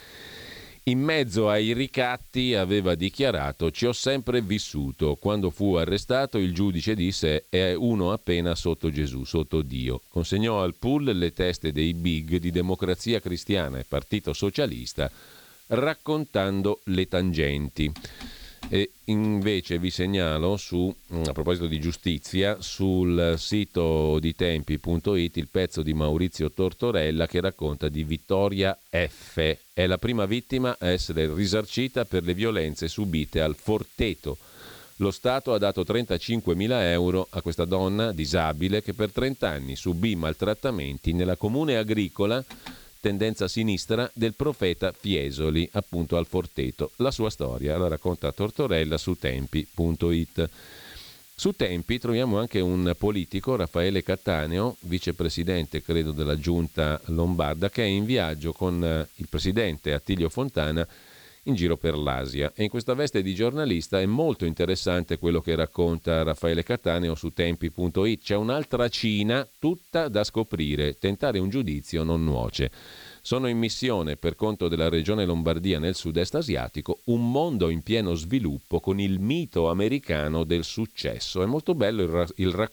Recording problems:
hiss; faint; throughout; 25 dB below the speech

